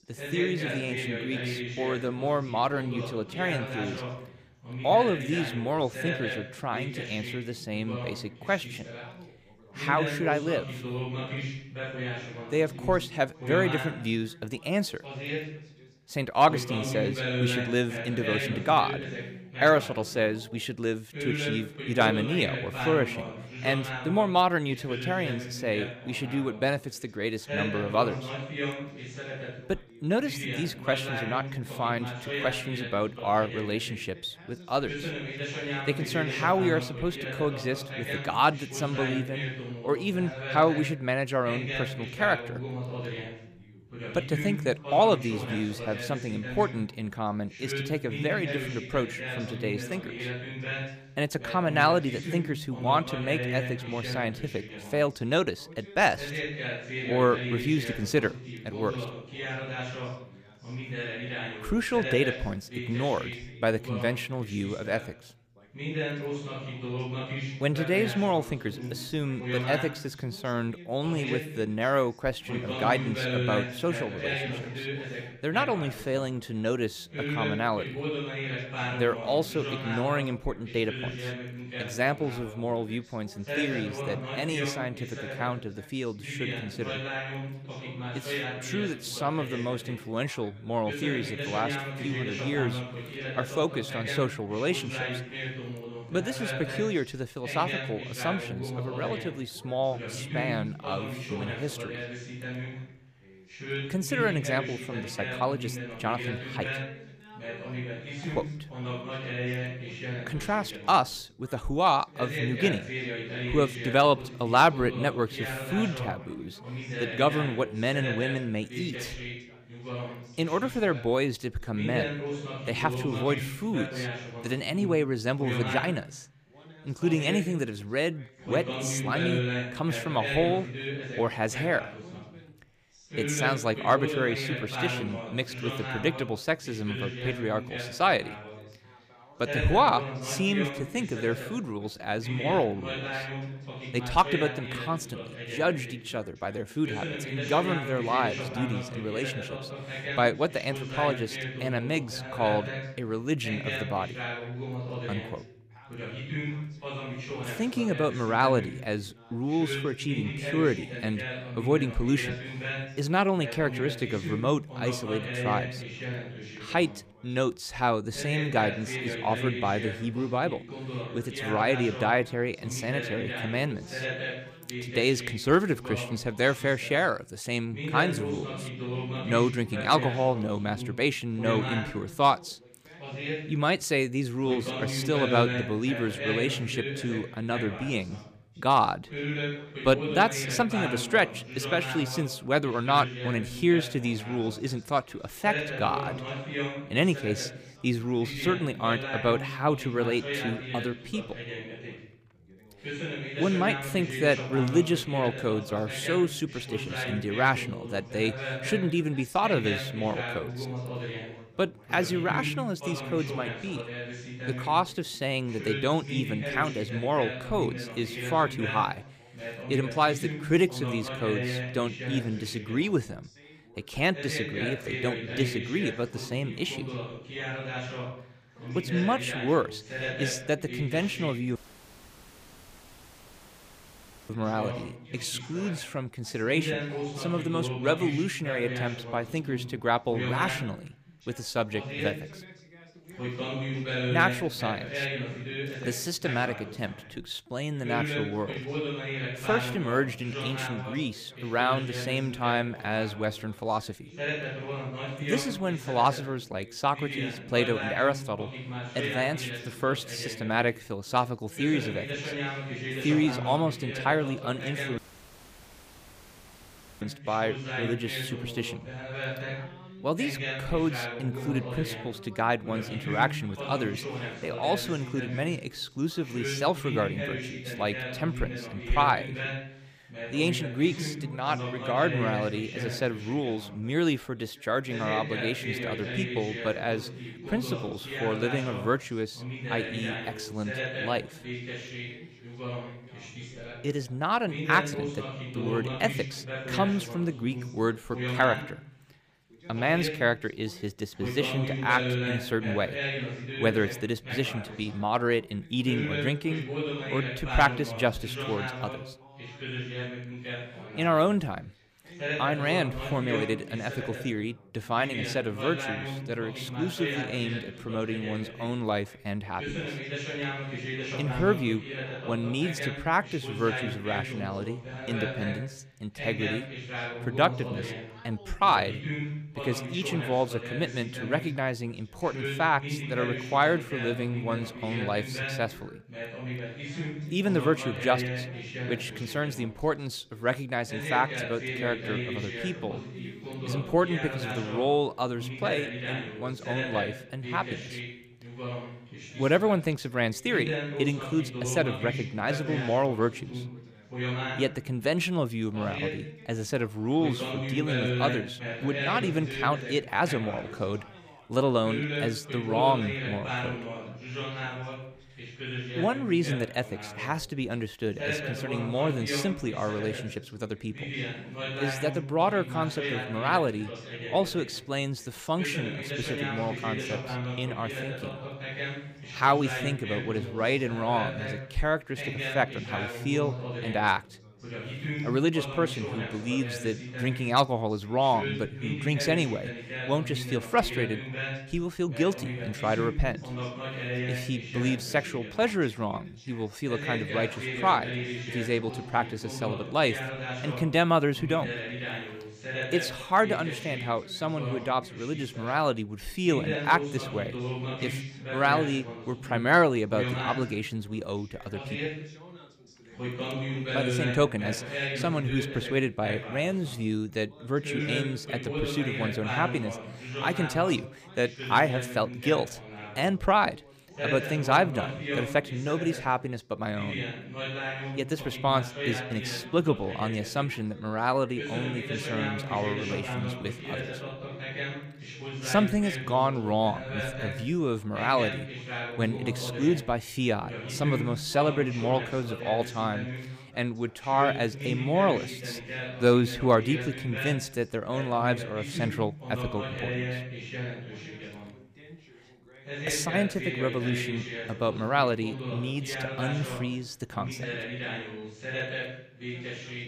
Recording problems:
background chatter; loud; throughout; 2 voices, 6 dB below the speech
audio cutting out; at 3:52 for 2.5 s and at 4:25 for 2 s

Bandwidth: 15 kHz